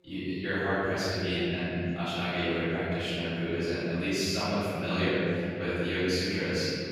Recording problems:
room echo; strong; dies away in 3 s
off-mic speech; far
voice in the background; faint; throughout; 30 dB below the speech

